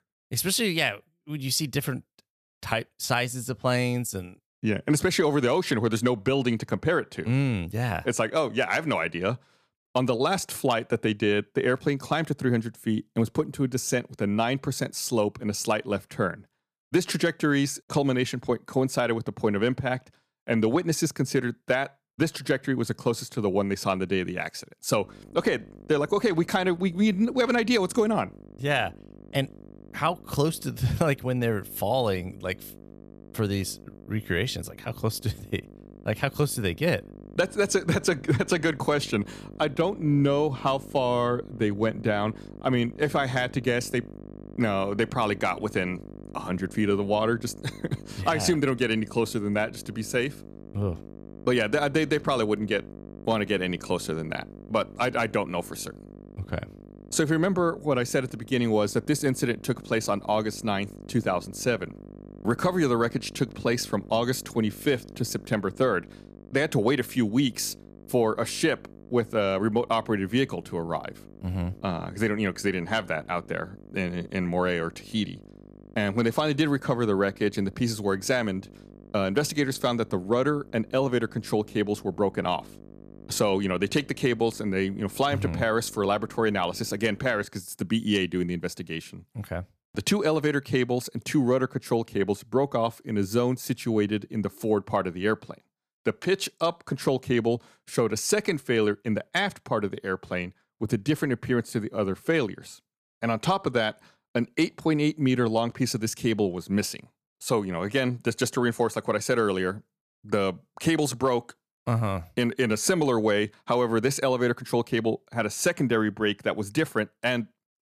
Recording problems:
electrical hum; faint; from 25 s to 1:27; 50 Hz, 25 dB below the speech

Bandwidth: 14.5 kHz